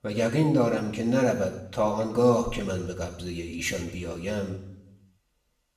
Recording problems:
off-mic speech; far
room echo; slight; dies away in 0.7 s

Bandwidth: 14.5 kHz